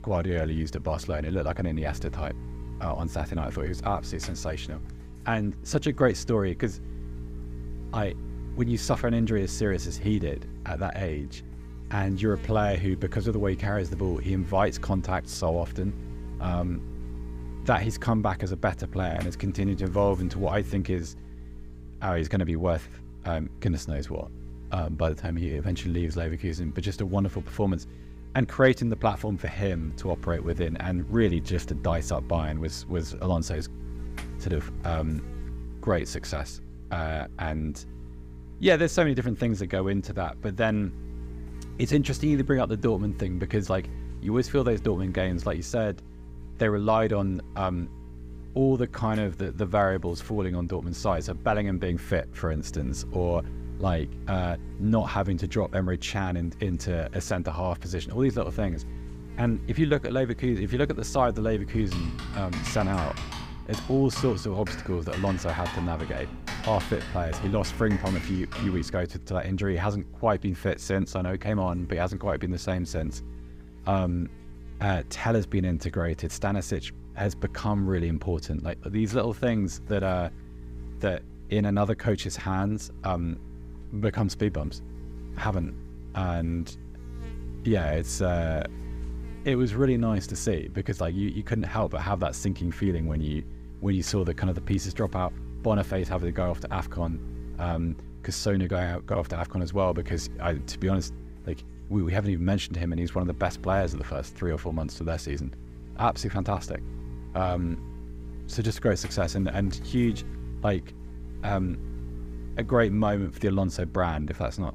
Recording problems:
electrical hum; noticeable; throughout; 60 Hz, 20 dB below the speech
keyboard typing; noticeable; from 1:02 to 1:09; peak 6 dB below the speech

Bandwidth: 15.5 kHz